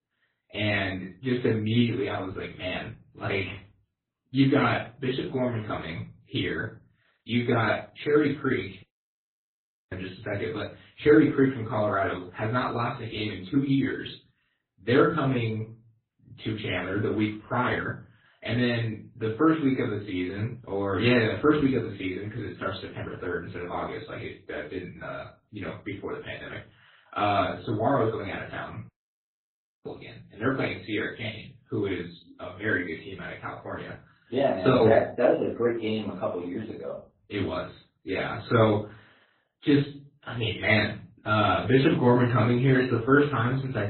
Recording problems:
off-mic speech; far
garbled, watery; badly; nothing above 4 kHz
room echo; slight; dies away in 0.3 s
audio cutting out; at 9 s for 1 s and at 29 s for 1 s

